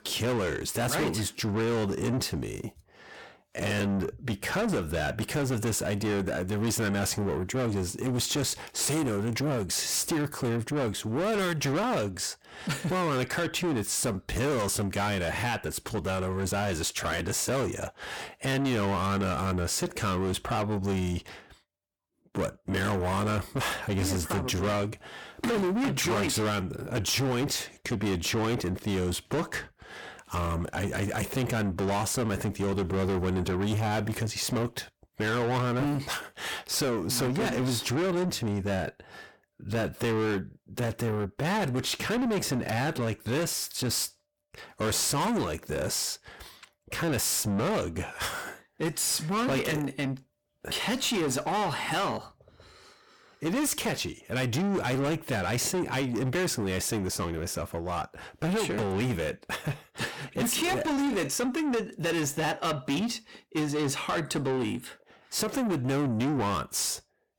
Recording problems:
distortion; heavy; 7 dB below the speech

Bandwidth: 18.5 kHz